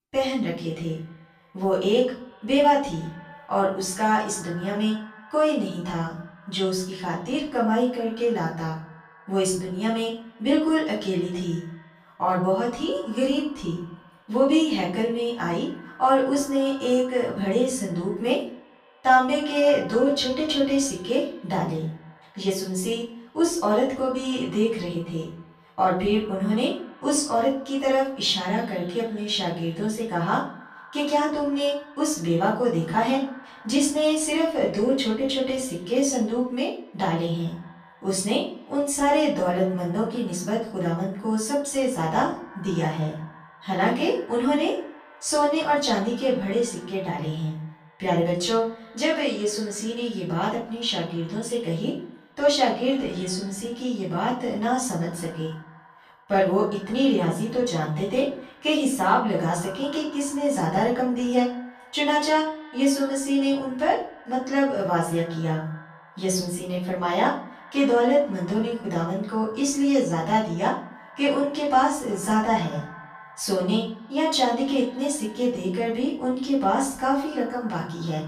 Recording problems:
off-mic speech; far
room echo; noticeable; dies away in 0.5 s
echo of what is said; faint; throughout; 110 ms later, 20 dB below the speech

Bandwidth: 14.5 kHz